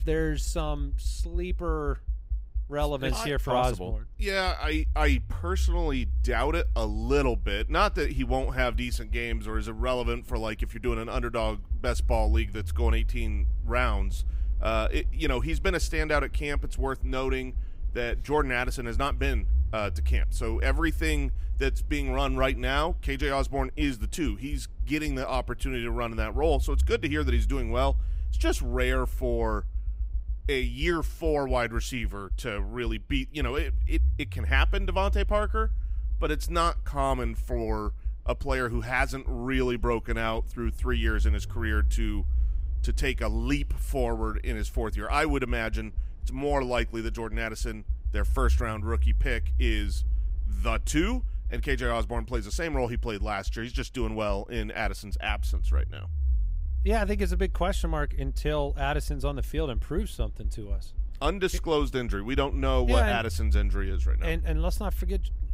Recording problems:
low rumble; faint; throughout; 25 dB below the speech

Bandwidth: 15.5 kHz